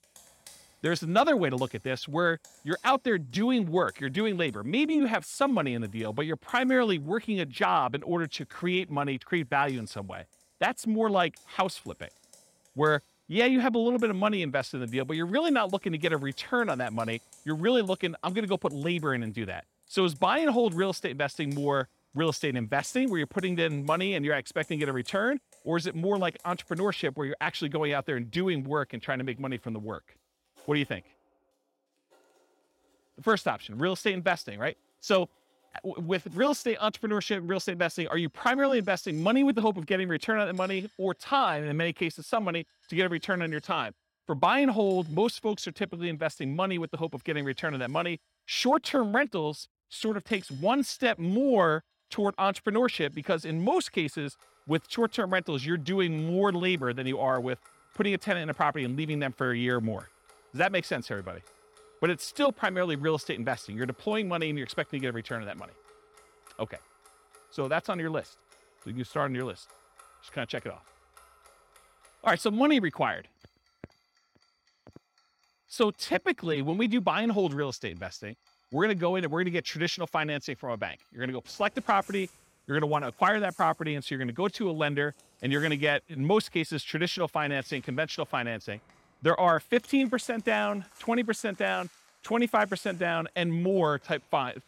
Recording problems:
household noises; faint; throughout; 30 dB below the speech

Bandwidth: 16.5 kHz